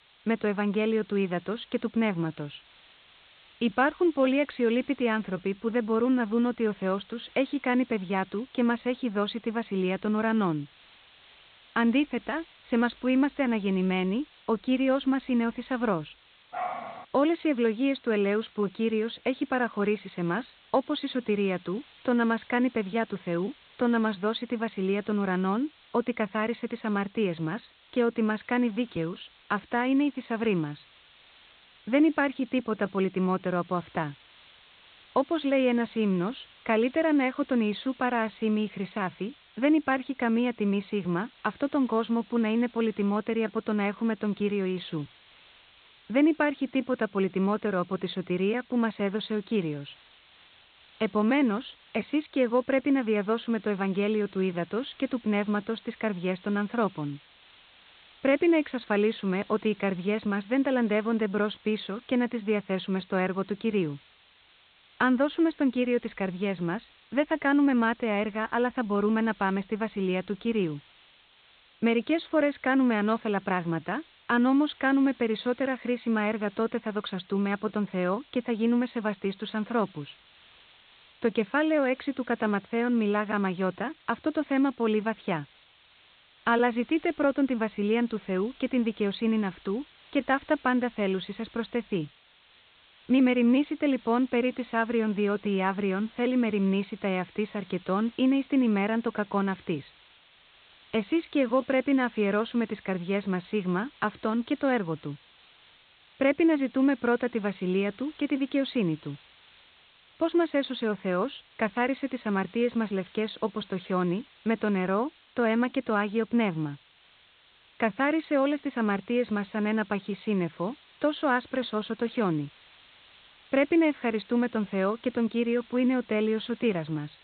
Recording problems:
high frequencies cut off; severe; nothing above 4 kHz
hiss; faint; throughout; 25 dB below the speech
dog barking; noticeable; at 17 s; peak 6 dB below the speech

